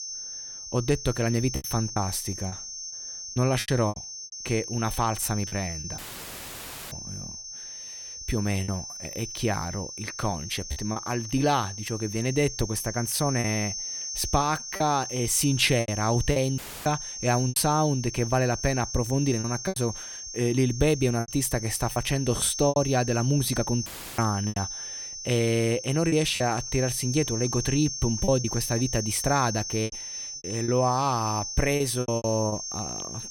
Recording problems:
high-pitched whine; loud; throughout; 6 kHz, 7 dB below the speech
choppy; very; 7% of the speech affected
audio cutting out; filled with static; at 6 s for 1 s, at 17 s and at 24 s

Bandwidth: 18 kHz